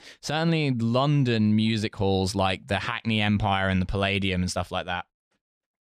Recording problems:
none

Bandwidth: 14.5 kHz